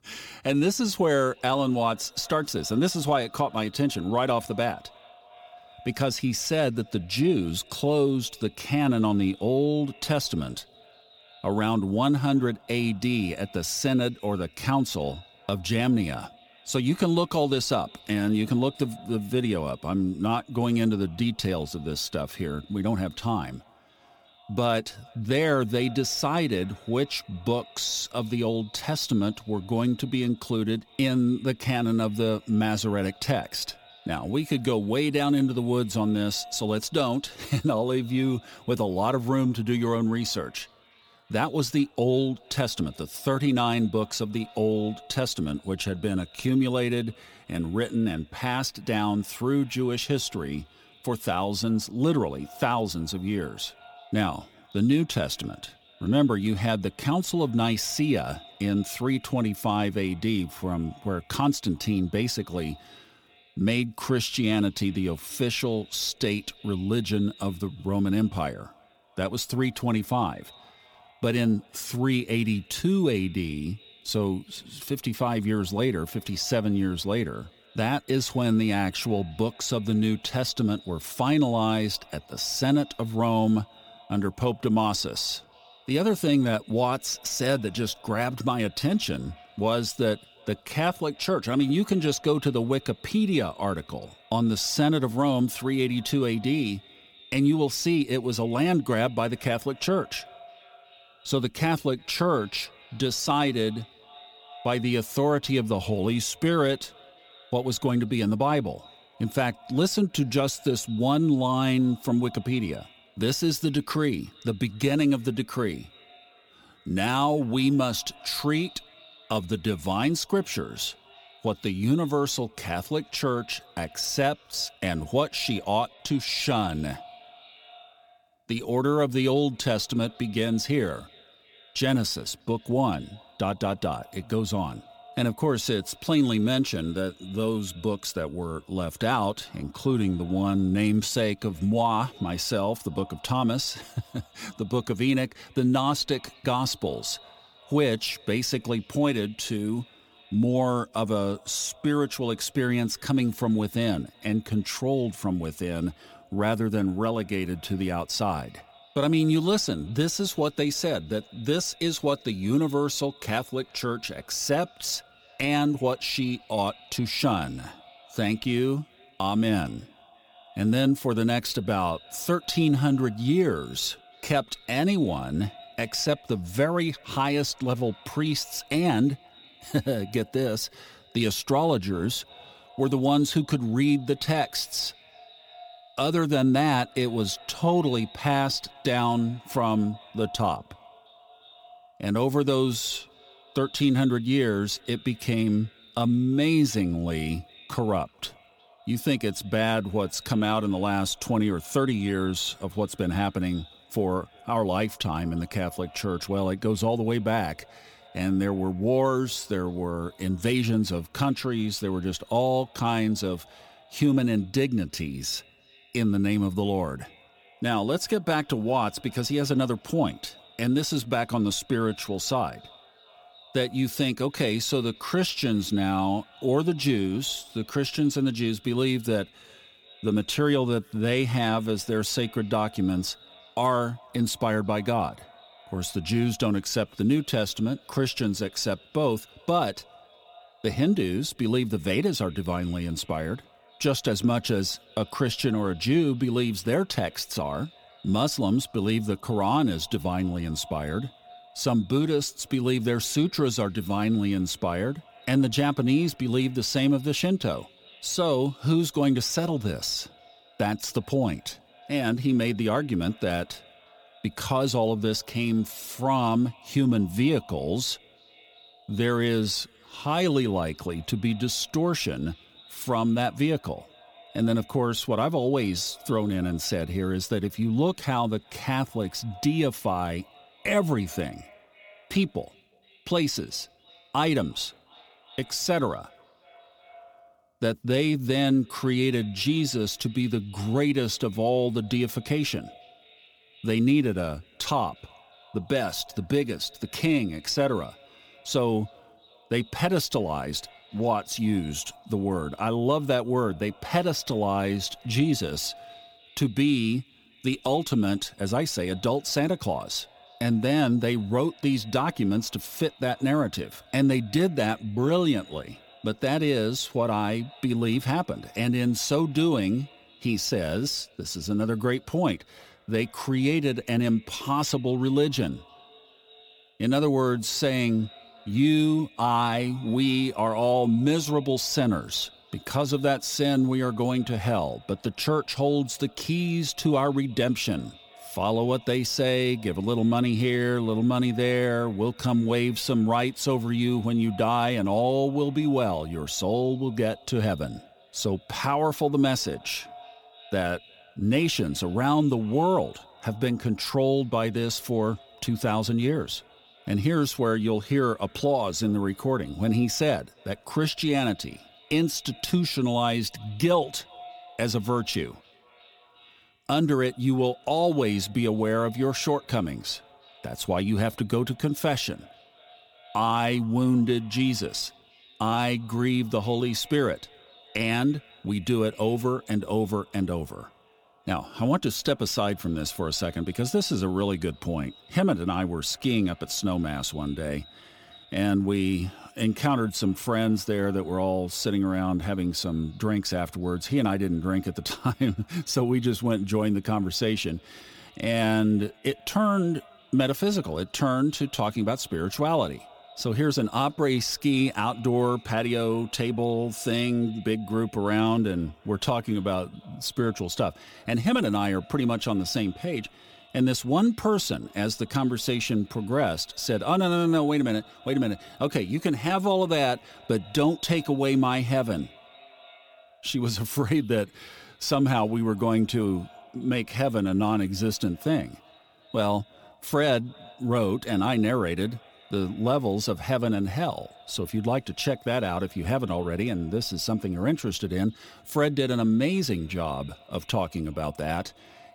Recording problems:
echo of what is said; faint; throughout; 360 ms later, 25 dB below the speech

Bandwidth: 18.5 kHz